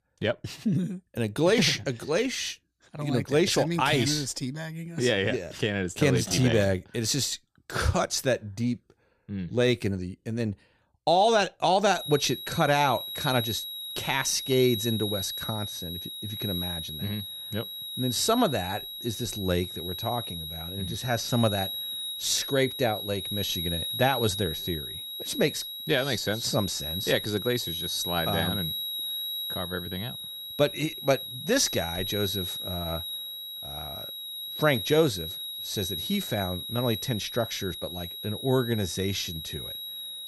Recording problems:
high-pitched whine; loud; from 12 s on; 4 kHz, 5 dB below the speech

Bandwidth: 14.5 kHz